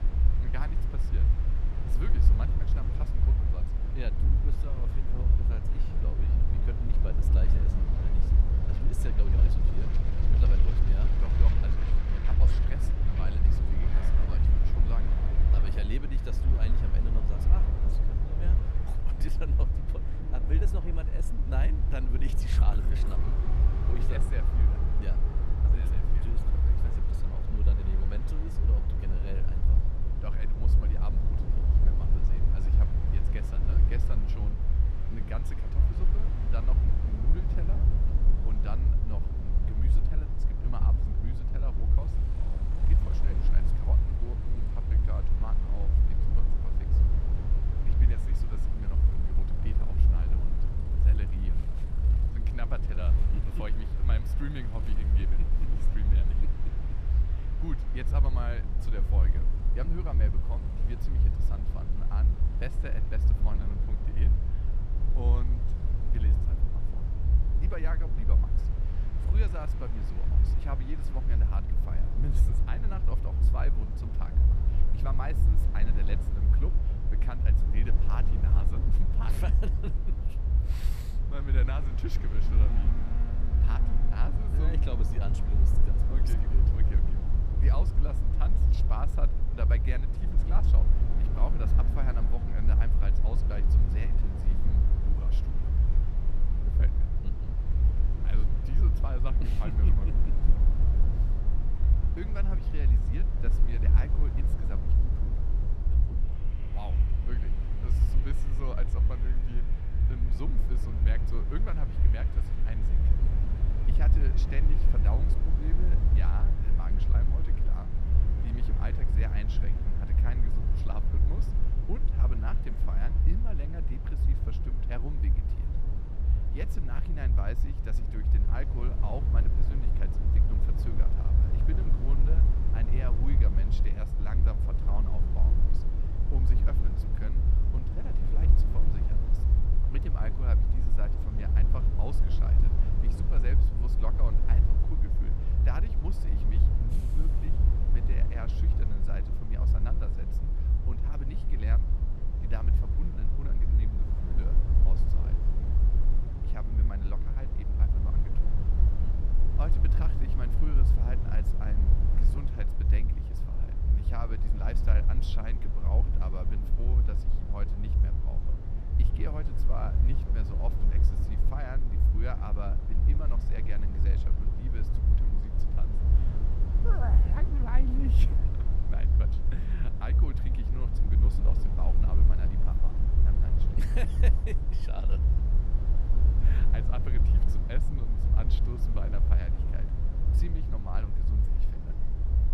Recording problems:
train or aircraft noise; loud; throughout; 10 dB below the speech
low rumble; loud; throughout; 1 dB below the speech
chatter from many people; faint; throughout; 25 dB below the speech

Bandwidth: 14.5 kHz